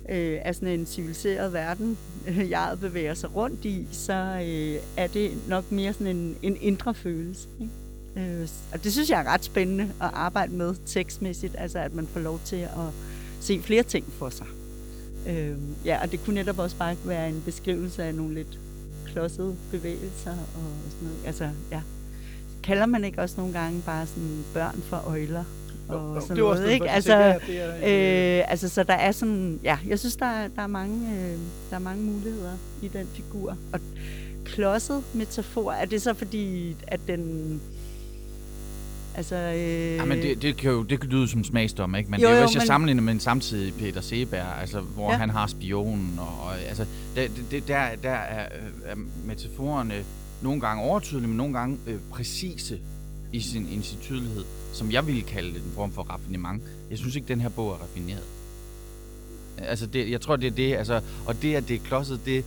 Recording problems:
electrical hum; noticeable; throughout; 50 Hz, 20 dB below the speech

